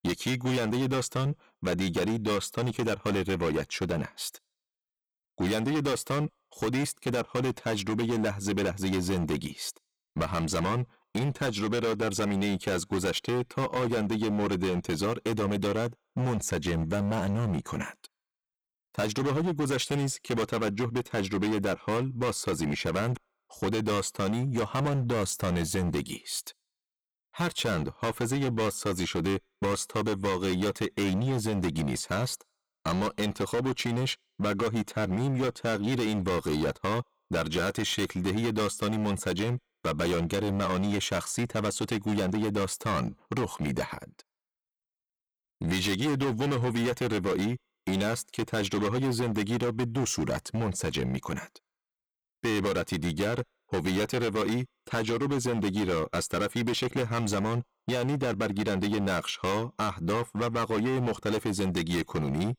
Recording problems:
distortion; heavy; 20% of the sound clipped

